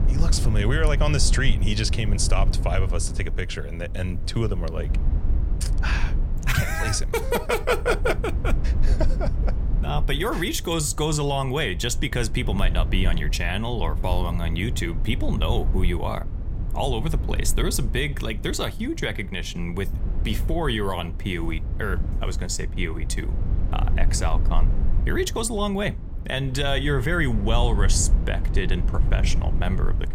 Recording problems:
low rumble; noticeable; throughout; 15 dB below the speech

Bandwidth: 16 kHz